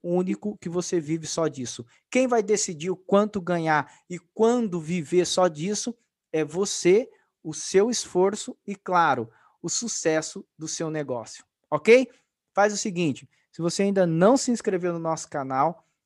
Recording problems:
none

